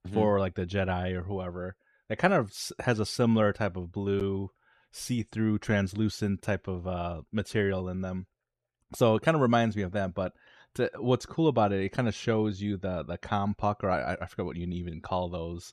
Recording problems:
none

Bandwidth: 13.5 kHz